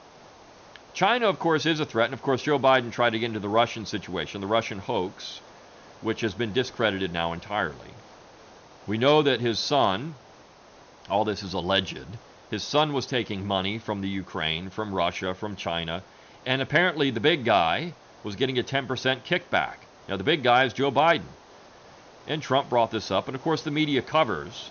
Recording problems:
high frequencies cut off; noticeable; nothing above 6.5 kHz
hiss; faint; throughout; 25 dB below the speech

